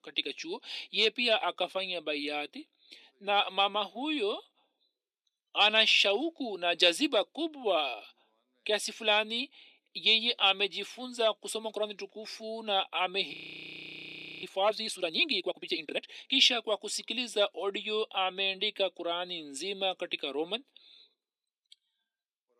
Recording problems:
thin; somewhat; fading below 250 Hz
audio freezing; at 13 s for 1 s

